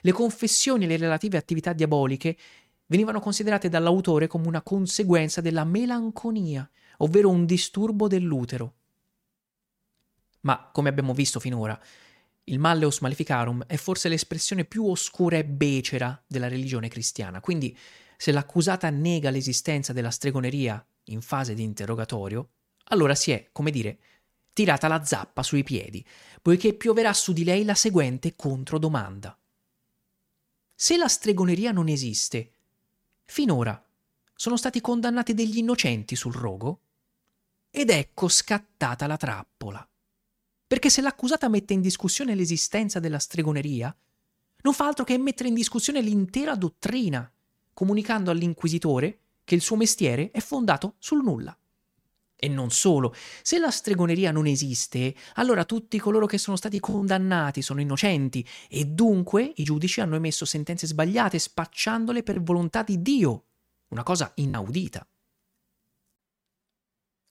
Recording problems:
choppy; occasionally; from 56 s to 1:00 and from 1:02 to 1:05; 3% of the speech affected

